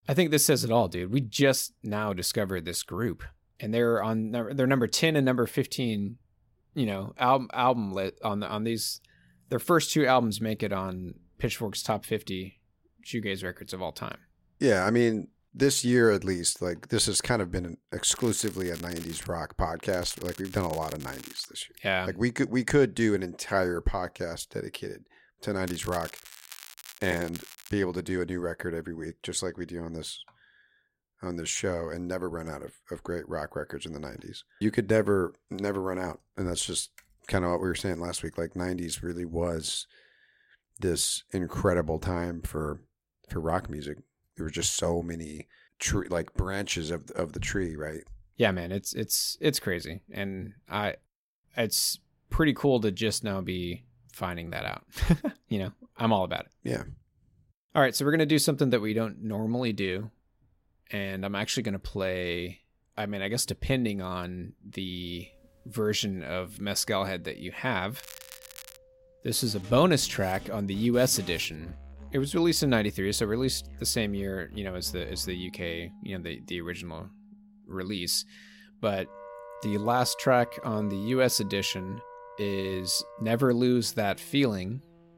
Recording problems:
background music; noticeable; from 1:05 on; 20 dB below the speech
crackling; noticeable; 4 times, first at 18 s; 15 dB below the speech

